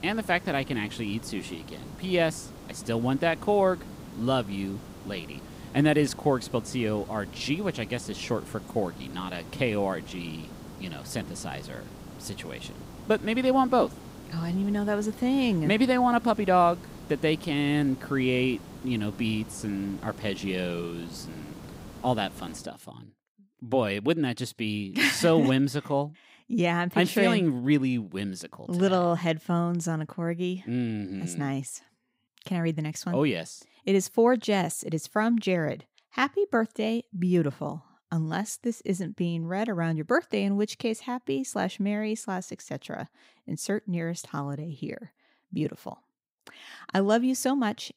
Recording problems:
hiss; noticeable; until 23 s; 15 dB below the speech

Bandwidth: 15.5 kHz